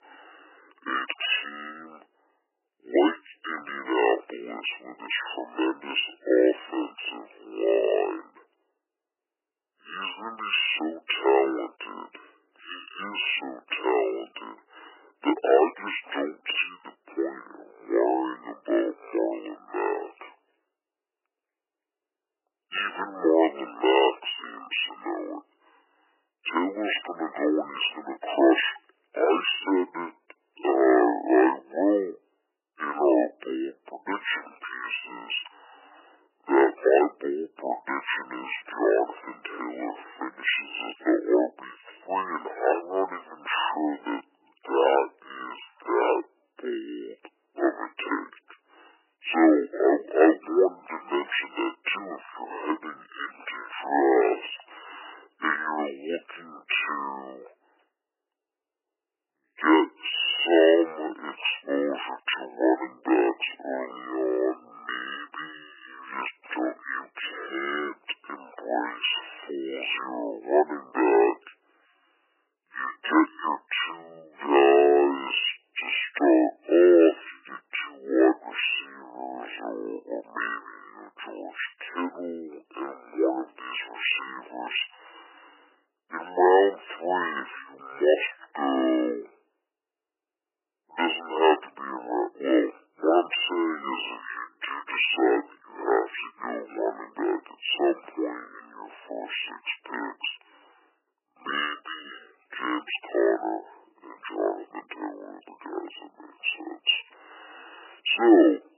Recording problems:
garbled, watery; badly; nothing above 3 kHz
thin; very; fading below 300 Hz
wrong speed and pitch; too slow and too low; 0.5 times normal speed

